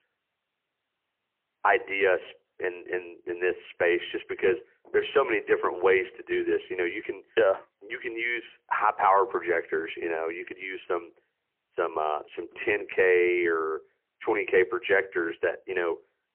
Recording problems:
phone-call audio; poor line; nothing above 3 kHz

